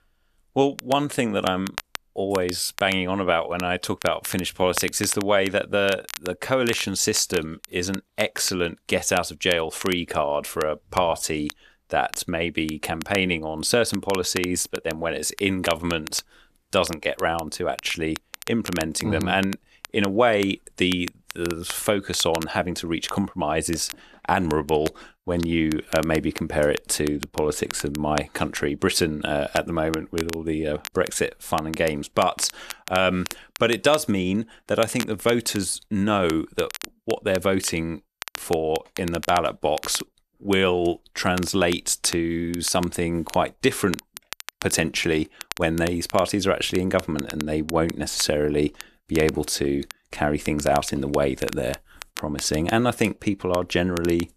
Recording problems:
crackle, like an old record; noticeable; 15 dB below the speech

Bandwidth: 13.5 kHz